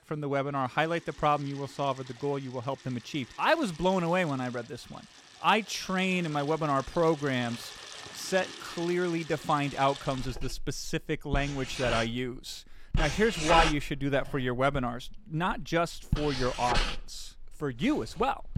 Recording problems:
household noises; loud; throughout; 7 dB below the speech

